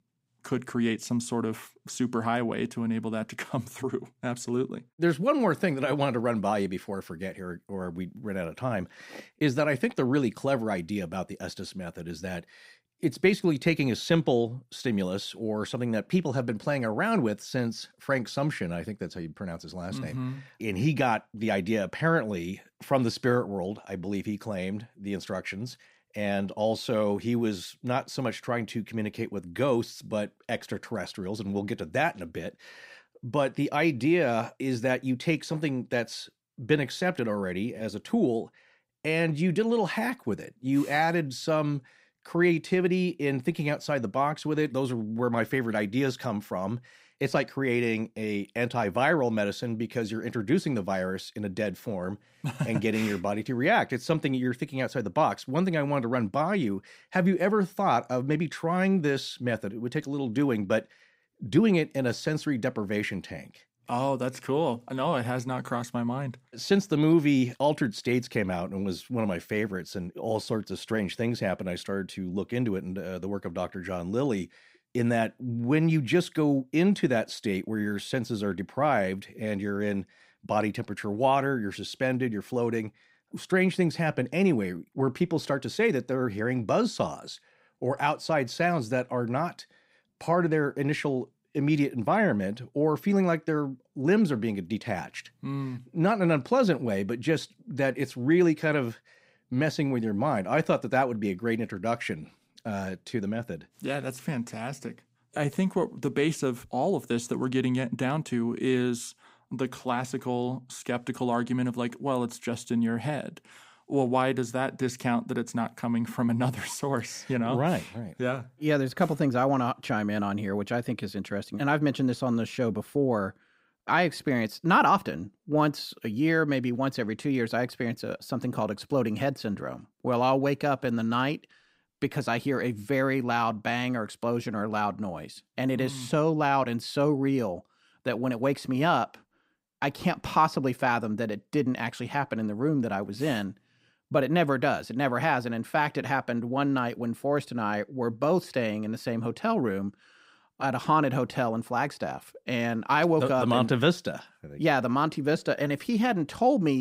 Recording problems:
abrupt cut into speech; at the end

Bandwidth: 15.5 kHz